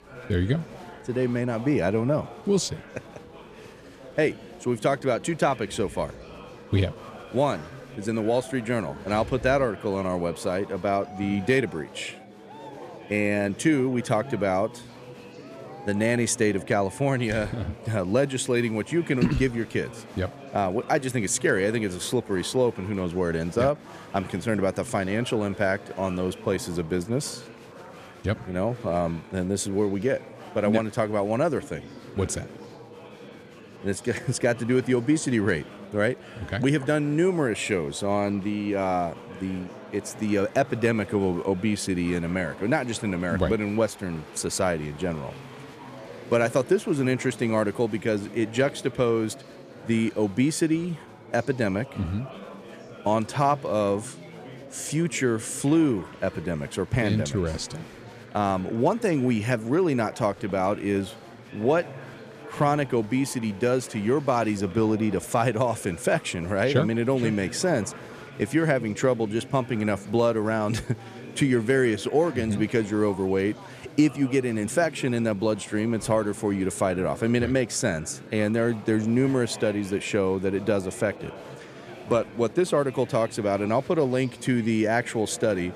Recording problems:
chatter from many people; noticeable; throughout; 15 dB below the speech

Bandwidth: 14.5 kHz